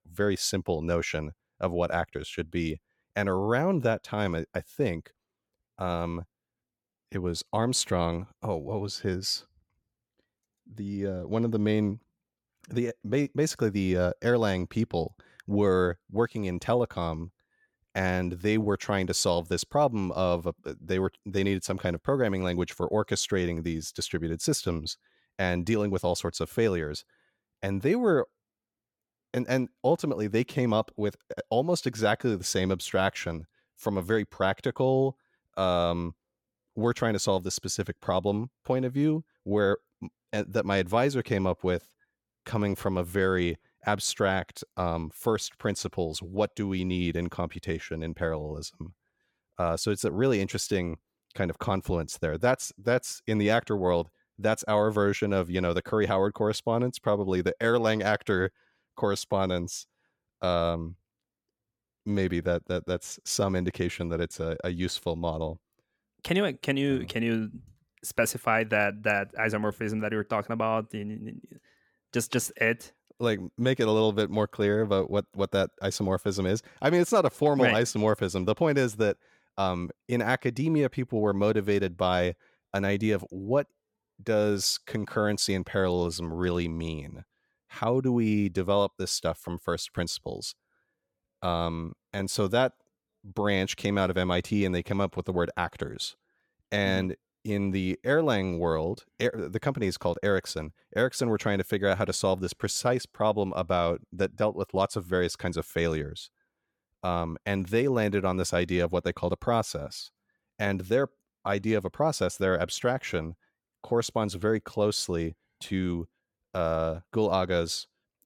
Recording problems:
none

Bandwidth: 17 kHz